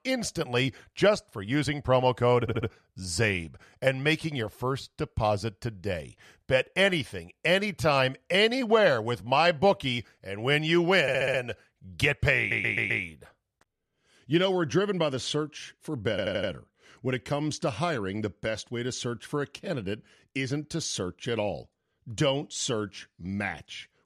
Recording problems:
audio stuttering; 4 times, first at 2.5 s

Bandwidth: 14.5 kHz